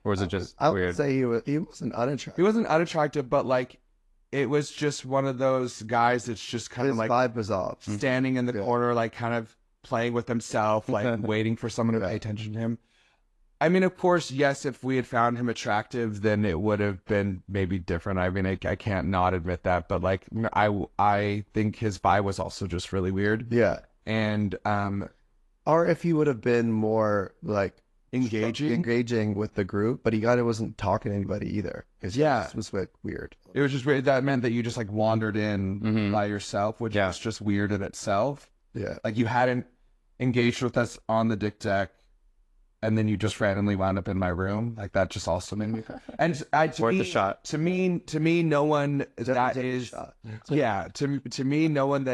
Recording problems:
garbled, watery; slightly; nothing above 11.5 kHz
abrupt cut into speech; at the end

